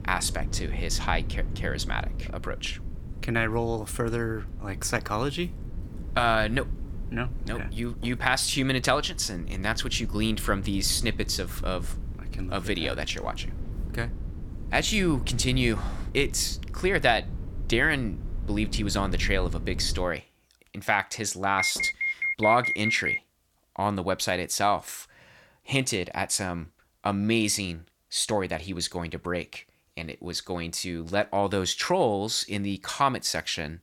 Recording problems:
low rumble; faint; until 20 s; 20 dB below the speech
alarm; loud; from 22 to 23 s; peak 2 dB above the speech

